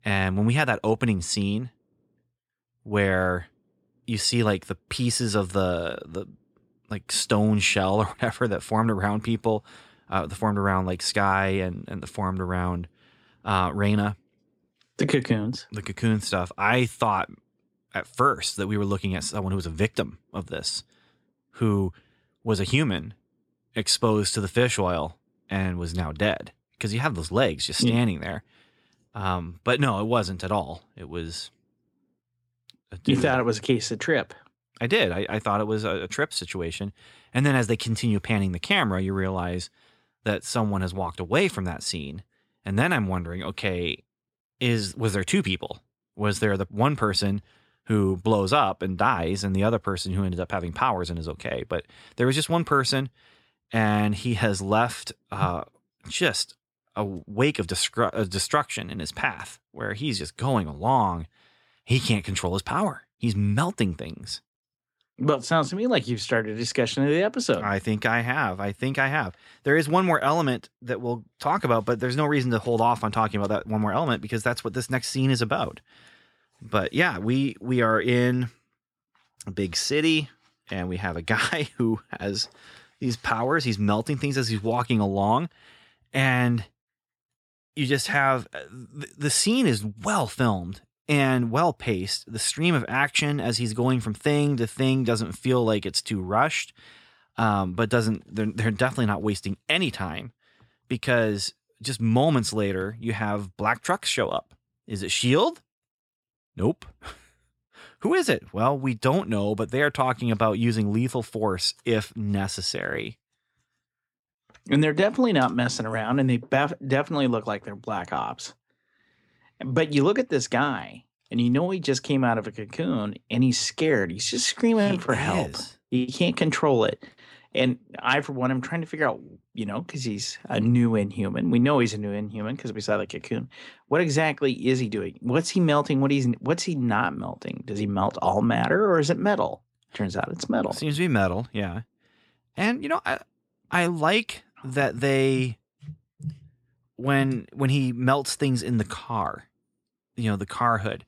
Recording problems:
none

